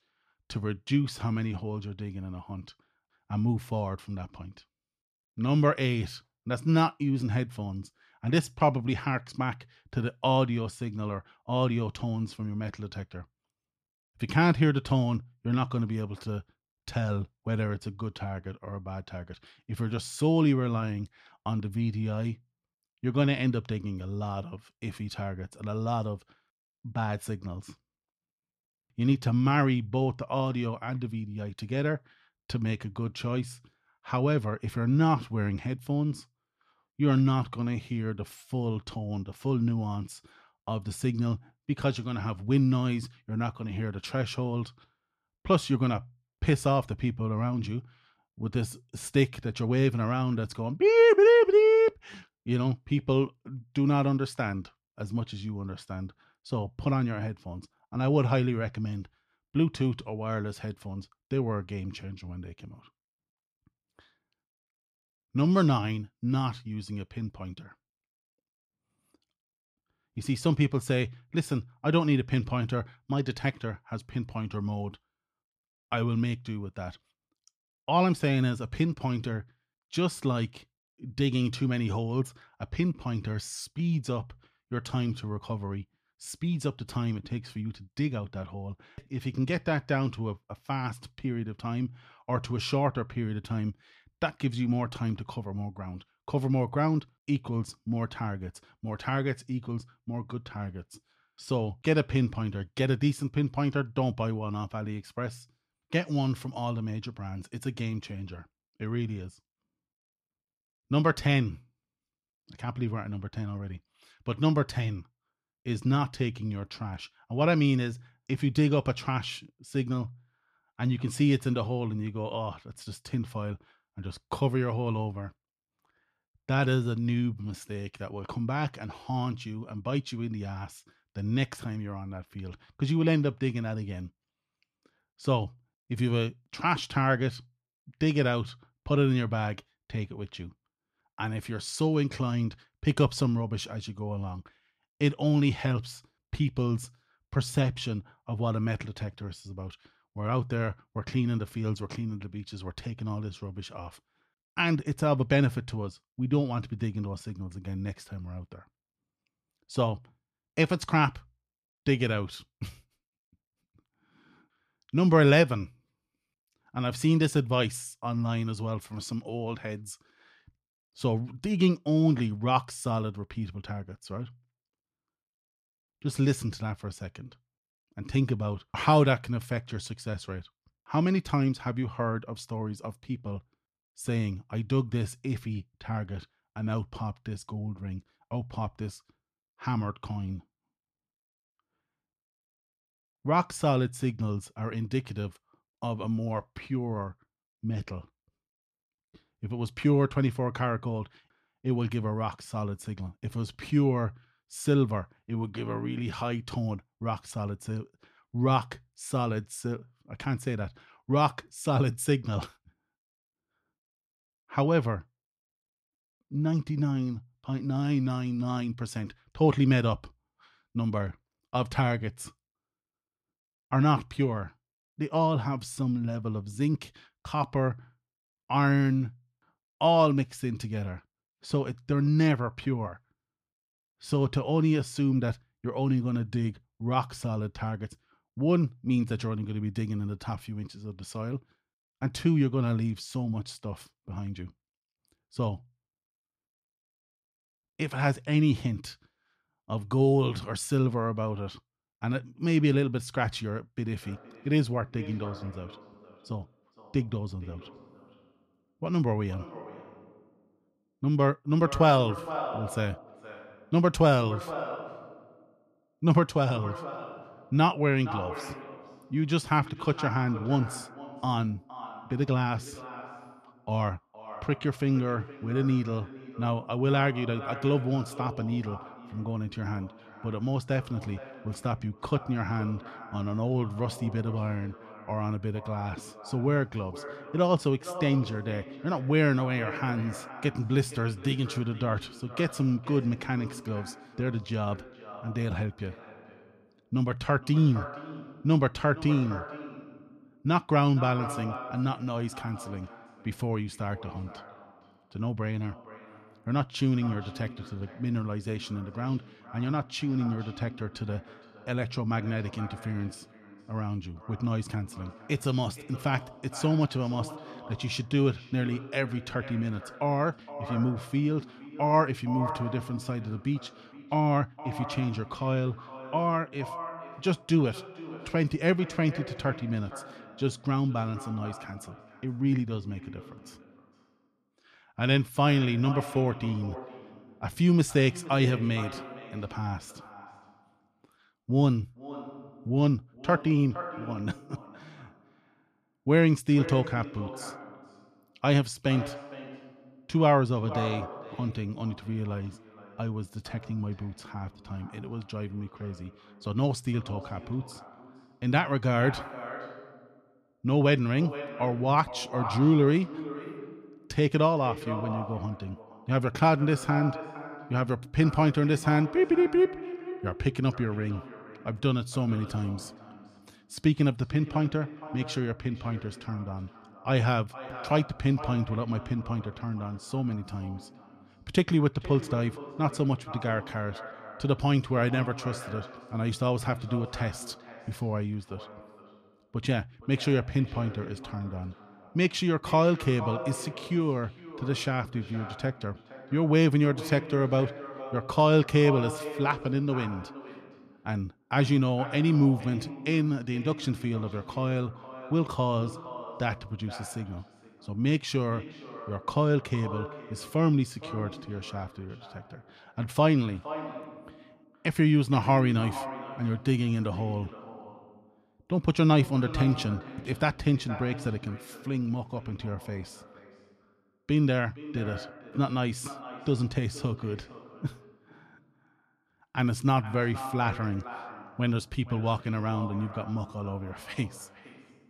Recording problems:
echo of what is said; noticeable; from 4:14 on; 470 ms later, 15 dB below the speech

